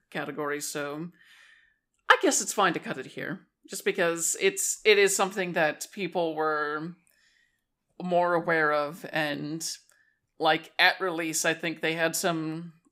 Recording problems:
none

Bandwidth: 15.5 kHz